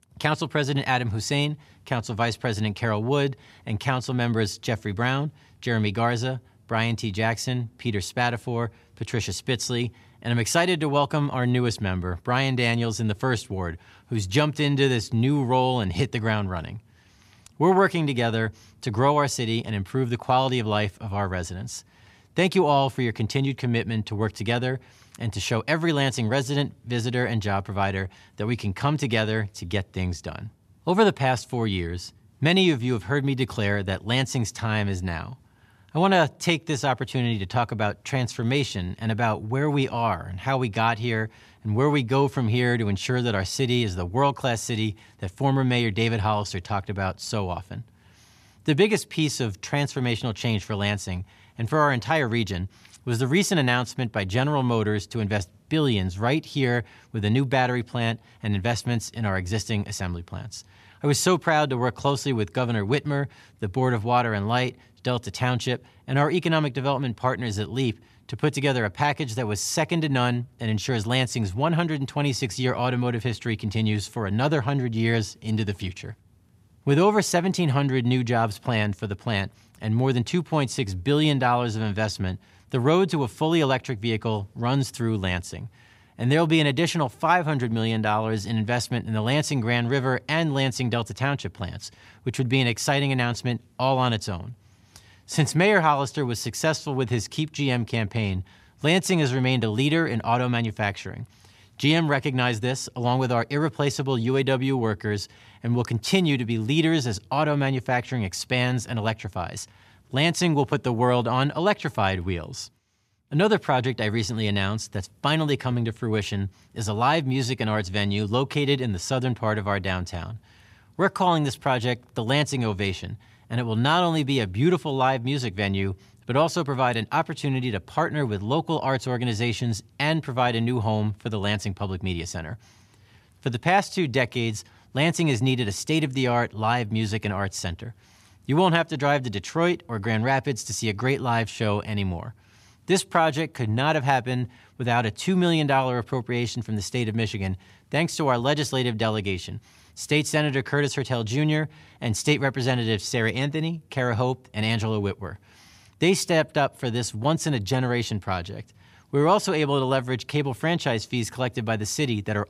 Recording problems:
none

